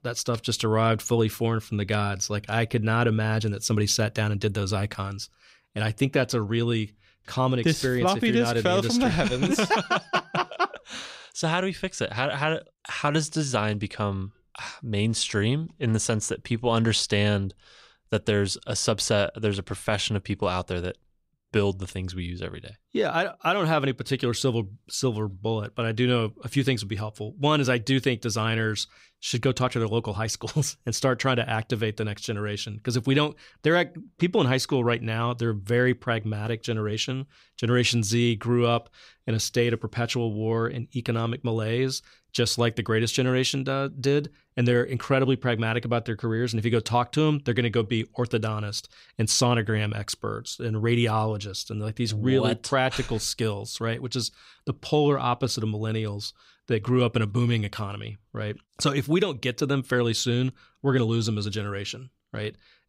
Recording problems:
none

